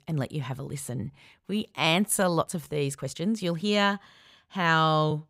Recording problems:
uneven, jittery; strongly

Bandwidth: 15.5 kHz